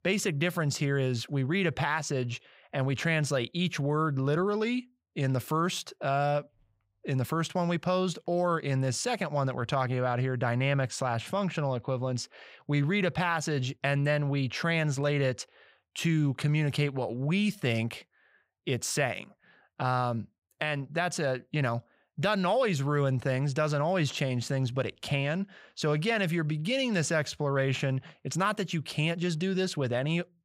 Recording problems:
none

